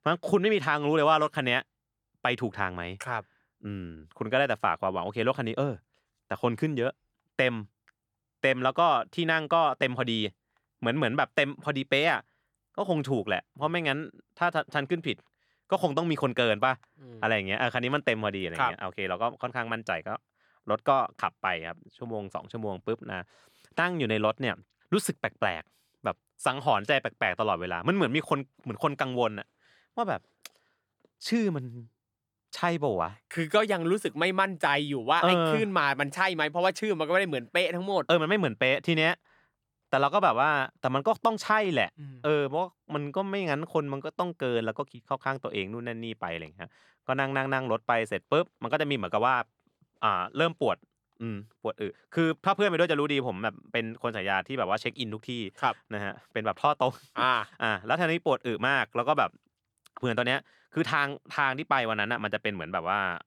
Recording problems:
none

